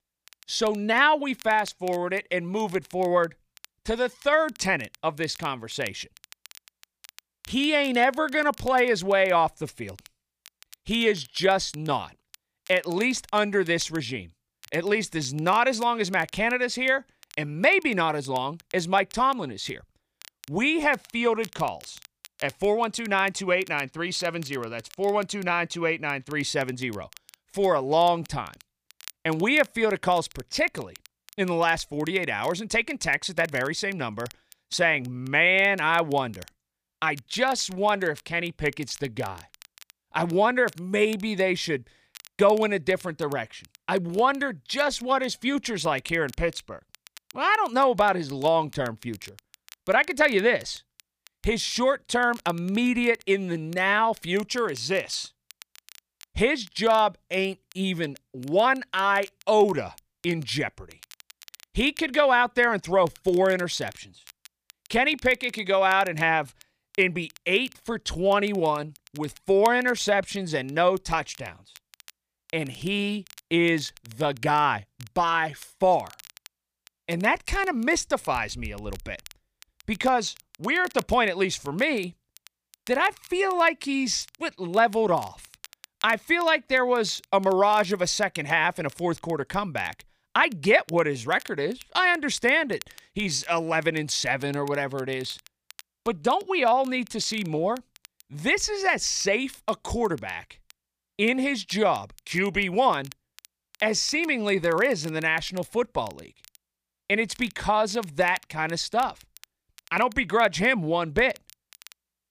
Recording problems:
crackle, like an old record; faint; 25 dB below the speech

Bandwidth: 15 kHz